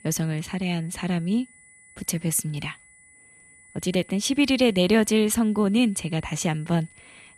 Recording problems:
high-pitched whine; faint; throughout; 2 kHz, 25 dB below the speech

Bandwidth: 13.5 kHz